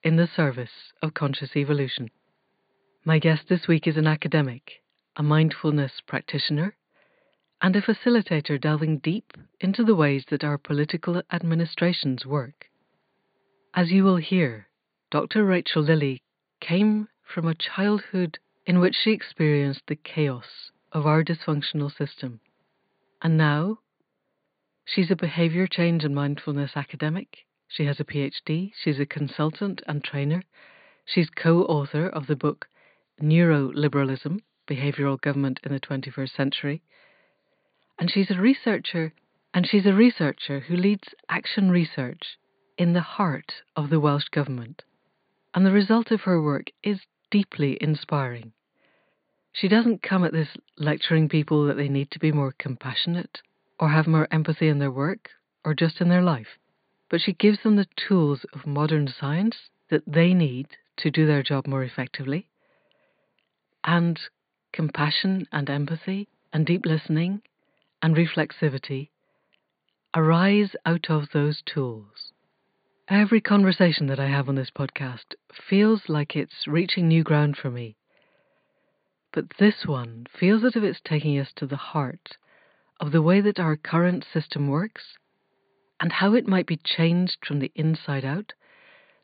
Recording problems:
high frequencies cut off; severe; nothing above 4.5 kHz

